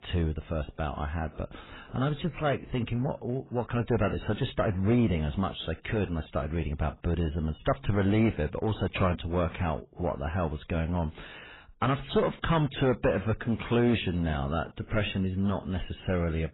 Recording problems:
garbled, watery; badly; nothing above 4 kHz
distortion; slight; 5% of the sound clipped

